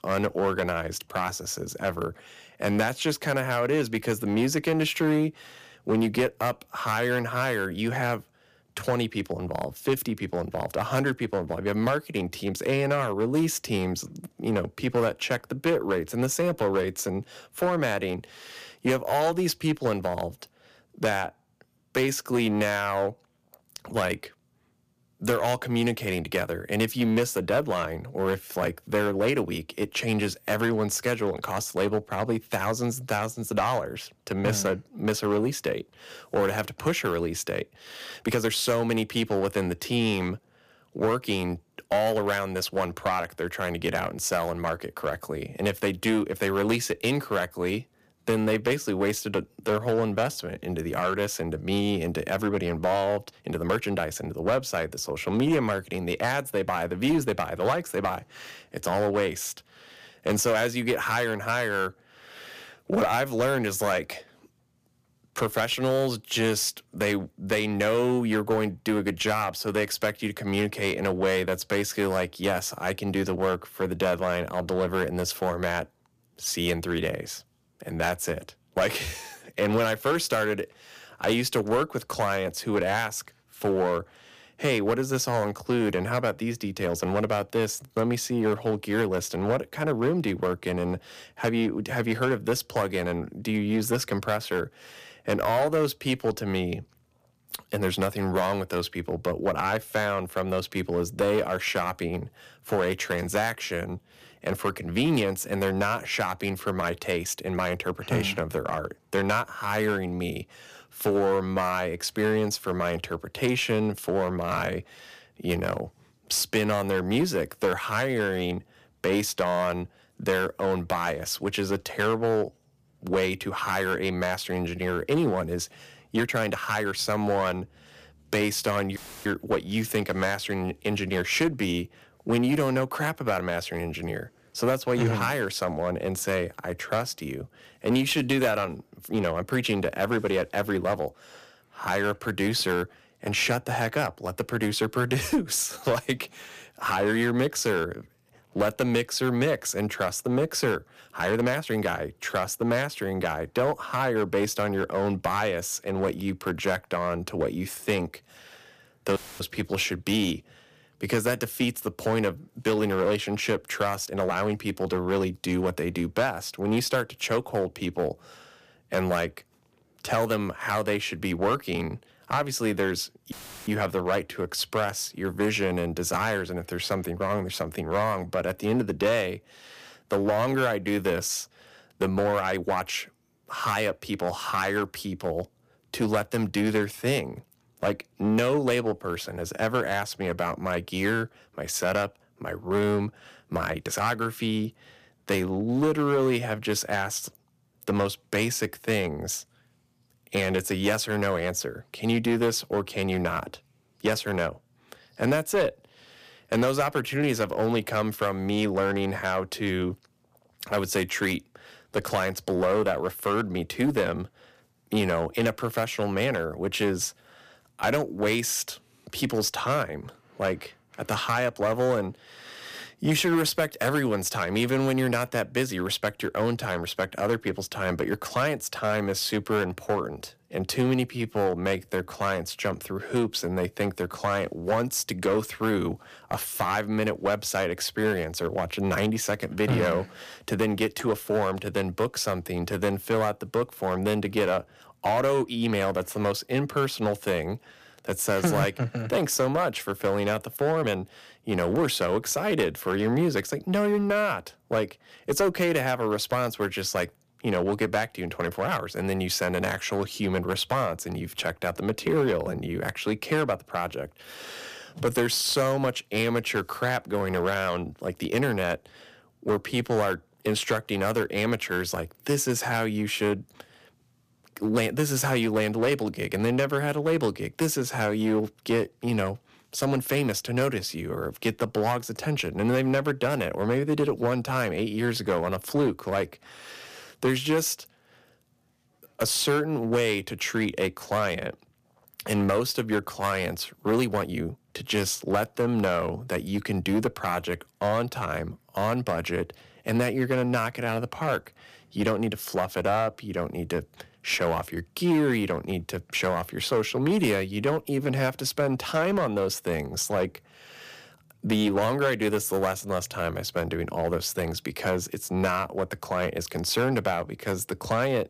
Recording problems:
distortion; slight; 5% of the sound clipped
uneven, jittery; strongly; from 38 s to 4:54
audio cutting out; filled with static; at 2:09, at 2:39 and at 2:53

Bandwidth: 15 kHz